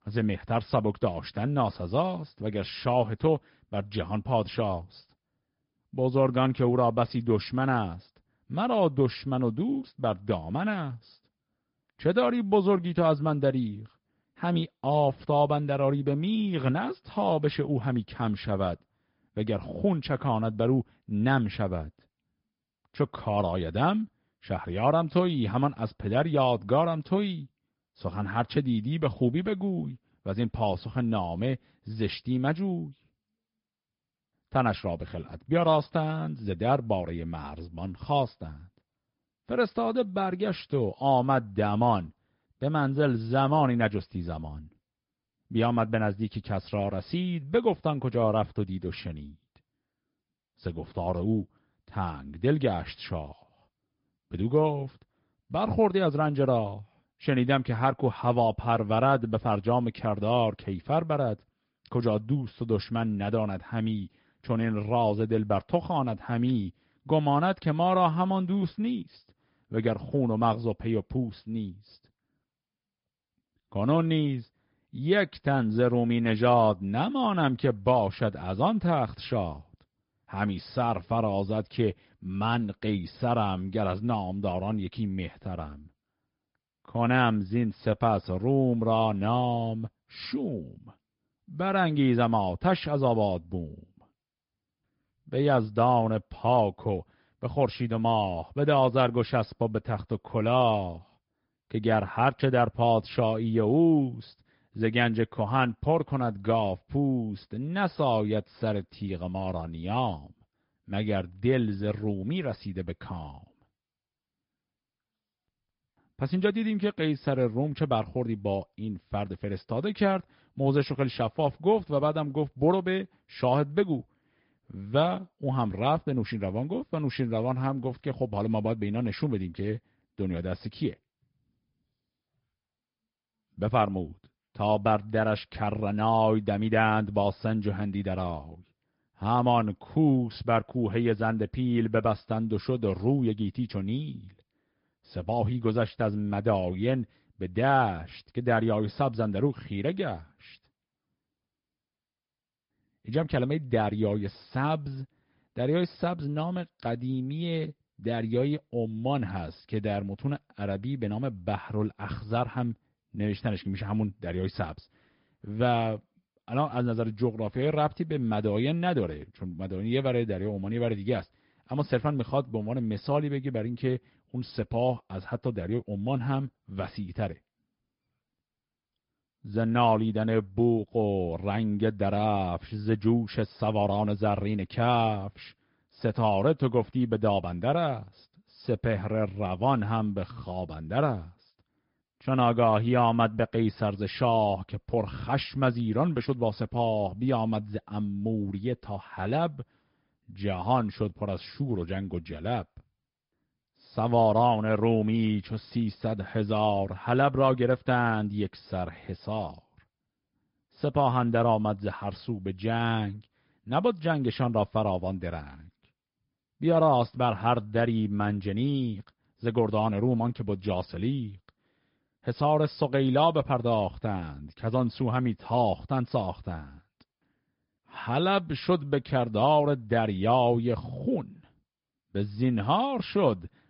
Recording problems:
high frequencies cut off; noticeable; nothing above 5 kHz
garbled, watery; slightly

